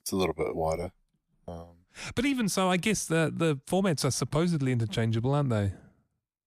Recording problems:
none

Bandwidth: 14.5 kHz